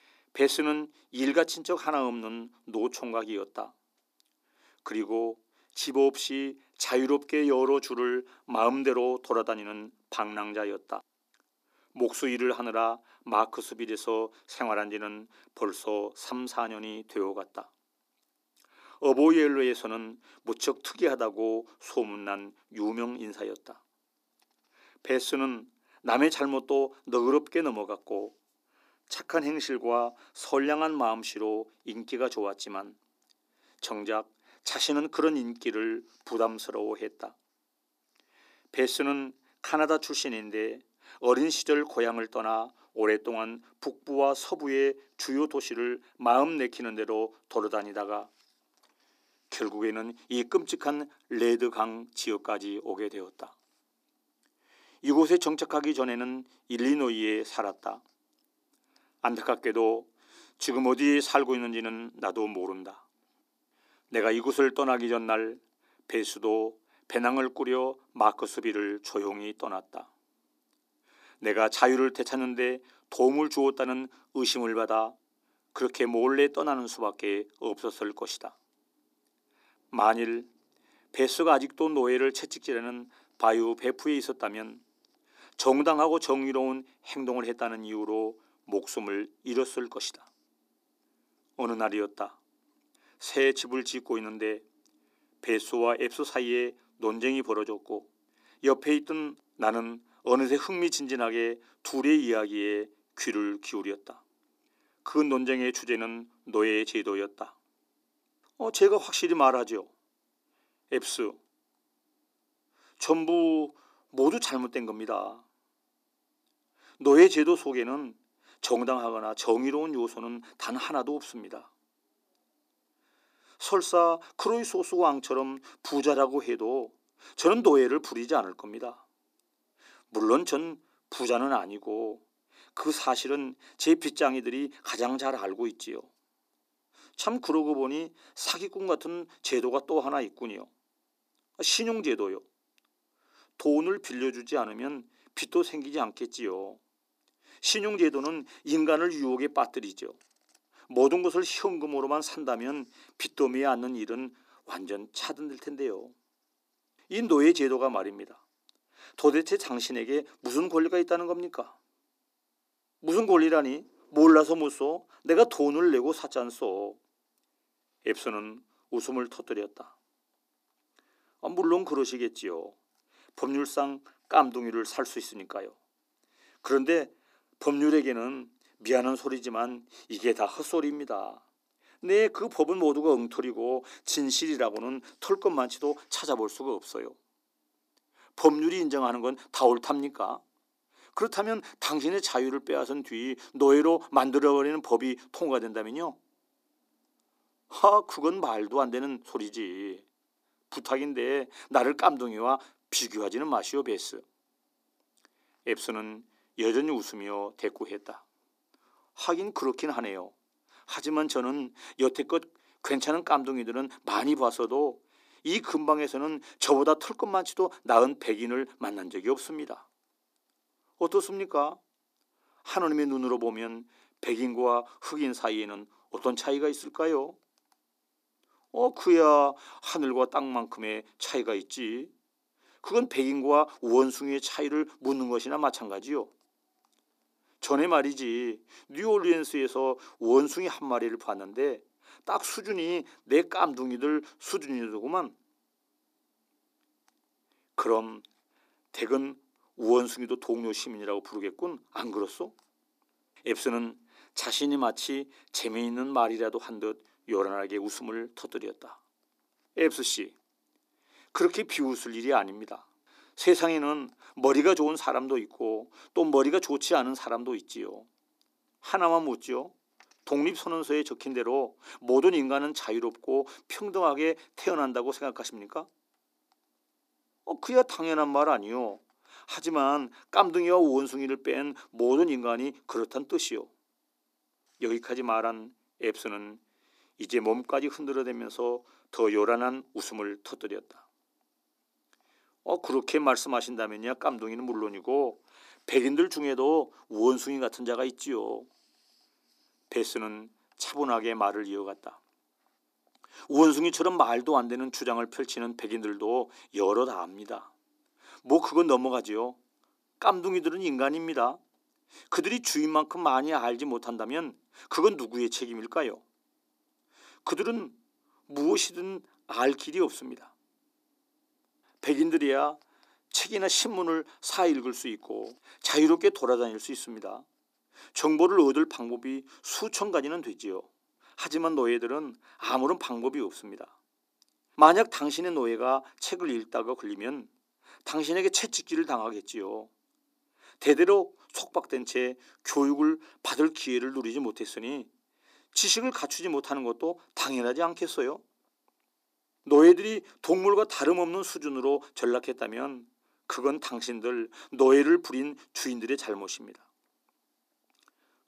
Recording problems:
thin; somewhat; fading below 300 Hz

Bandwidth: 15 kHz